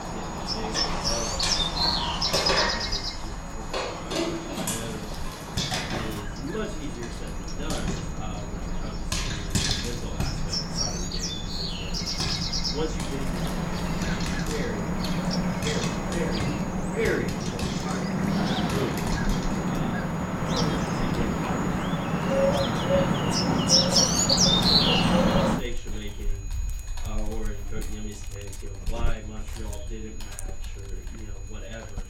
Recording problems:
off-mic speech; far
room echo; very slight; dies away in 0.3 s
animal sounds; very loud; throughout; 10 dB above the speech
household noises; very loud; throughout; 5 dB above the speech
high-pitched whine; noticeable; throughout; 6.5 kHz, 10 dB below the speech
low rumble; faint; until 18 s and from 25 s on; 25 dB below the speech

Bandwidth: 16.5 kHz